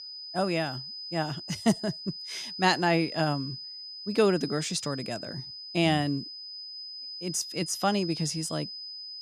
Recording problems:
high-pitched whine; loud; throughout; 5 kHz, 9 dB below the speech

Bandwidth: 14.5 kHz